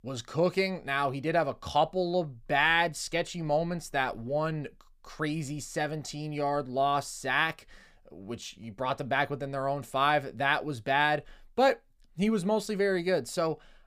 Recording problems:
none

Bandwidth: 15 kHz